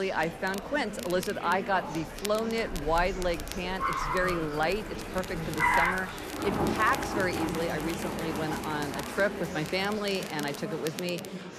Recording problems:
traffic noise; loud; throughout; 2 dB below the speech
murmuring crowd; loud; throughout; 8 dB below the speech
crackle, like an old record; noticeable; 15 dB below the speech
abrupt cut into speech; at the start

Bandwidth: 14 kHz